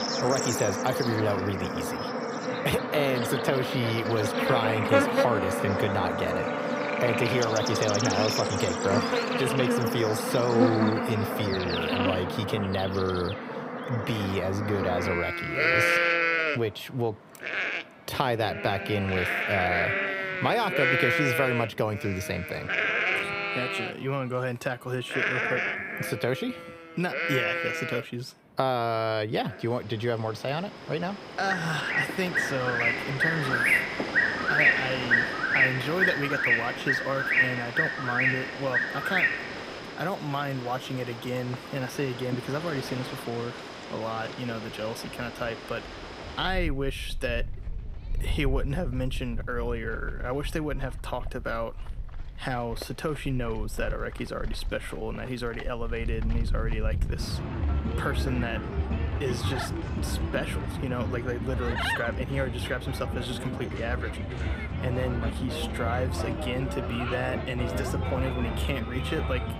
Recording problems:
animal sounds; very loud; throughout; 3 dB above the speech

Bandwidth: 15.5 kHz